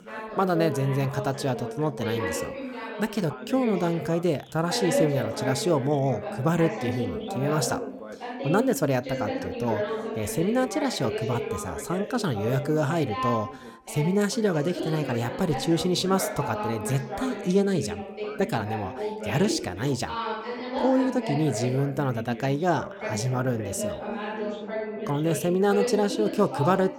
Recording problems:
background chatter; loud; throughout; 2 voices, 6 dB below the speech

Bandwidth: 18 kHz